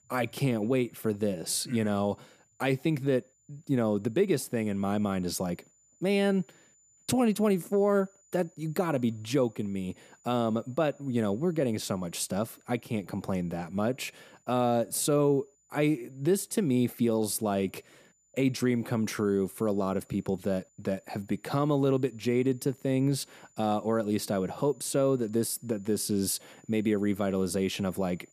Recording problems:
high-pitched whine; faint; throughout; 7 kHz, 35 dB below the speech

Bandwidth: 14.5 kHz